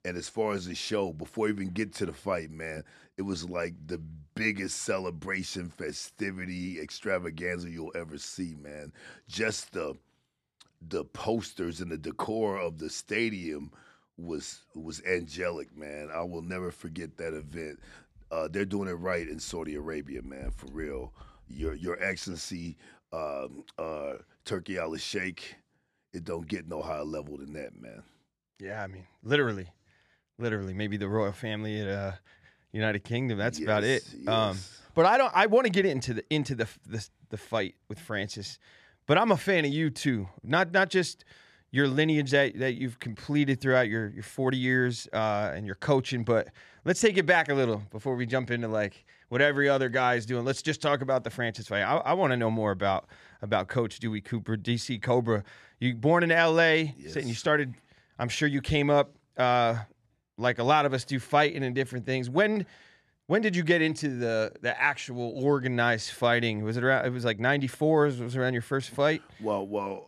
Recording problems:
none

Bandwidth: 13.5 kHz